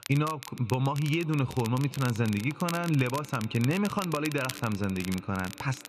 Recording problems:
muffled; slightly; fading above 3 kHz
echo of what is said; faint; throughout; 140 ms later, 20 dB below the speech
crackle, like an old record; noticeable; 15 dB below the speech

